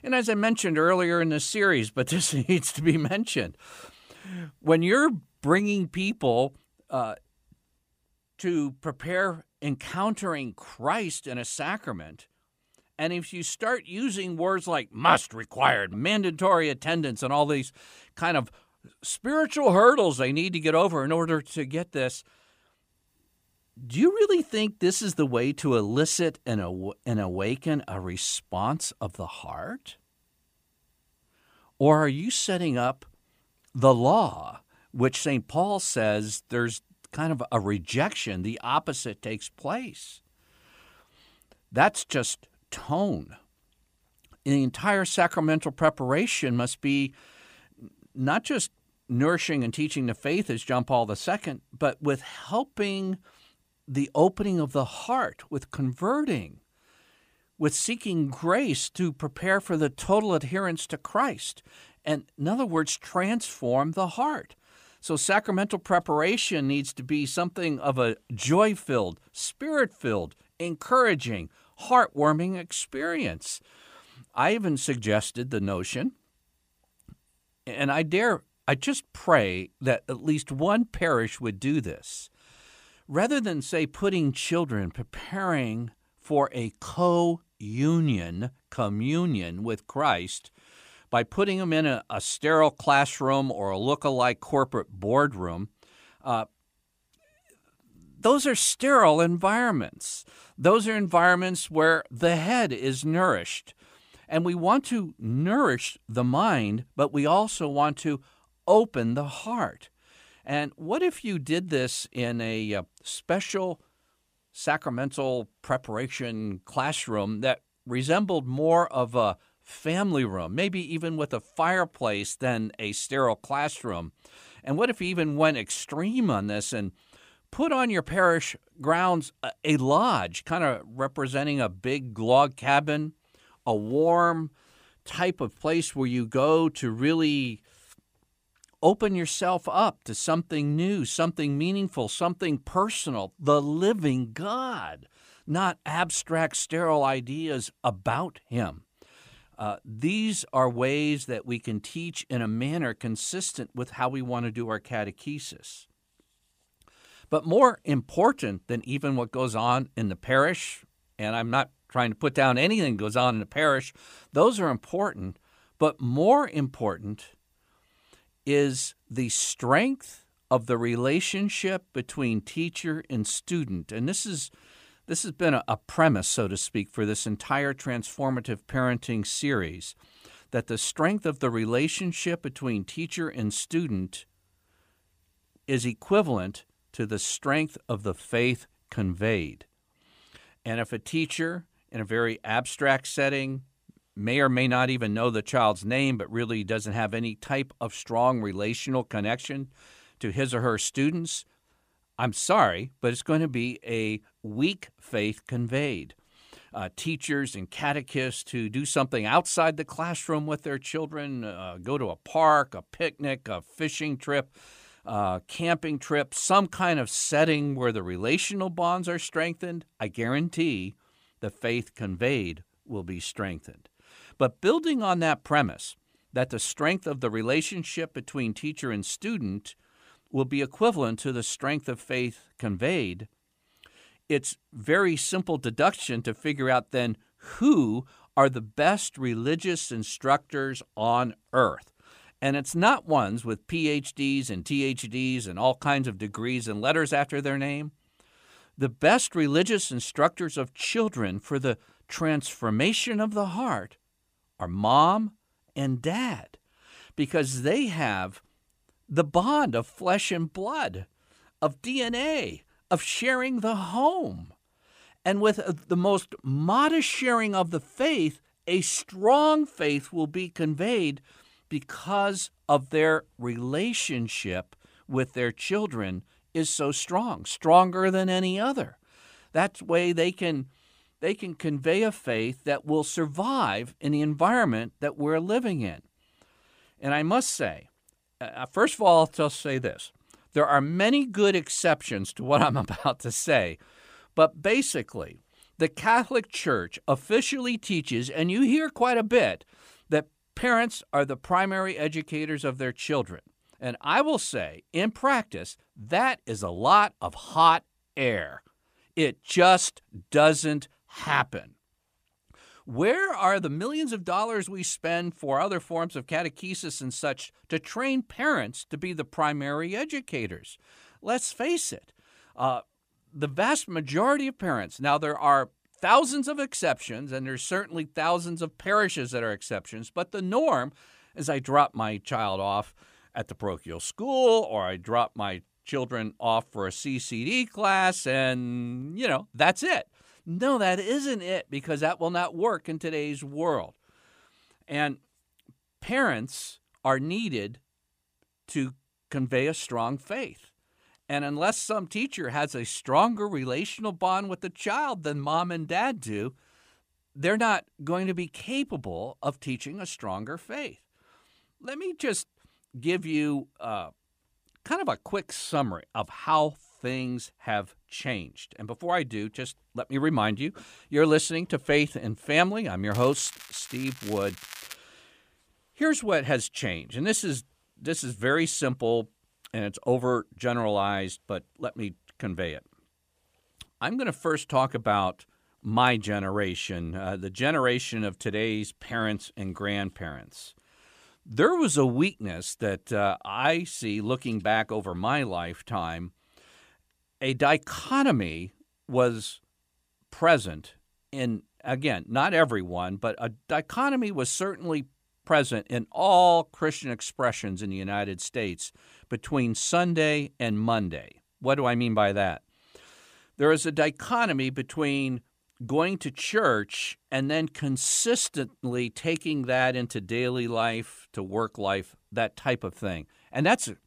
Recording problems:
crackling; noticeable; from 6:13 to 6:15; 15 dB below the speech

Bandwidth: 15 kHz